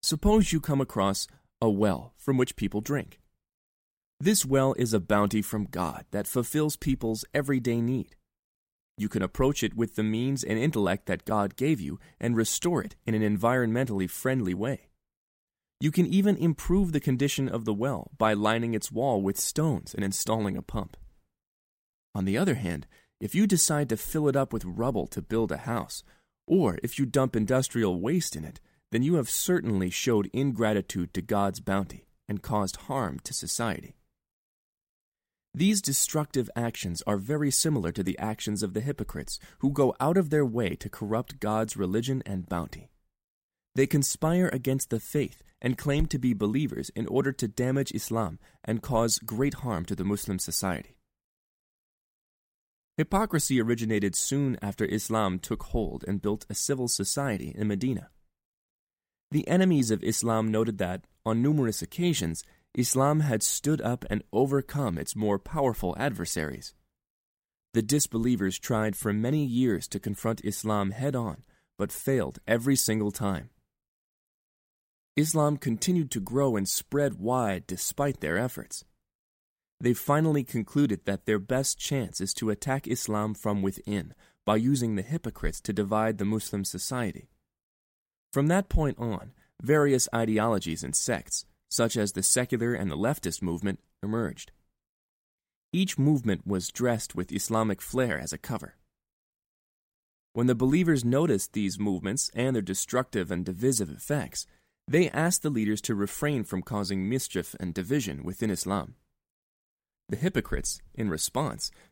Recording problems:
none

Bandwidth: 16 kHz